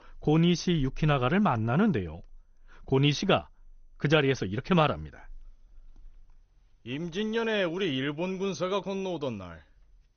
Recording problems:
garbled, watery; slightly; nothing above 6.5 kHz

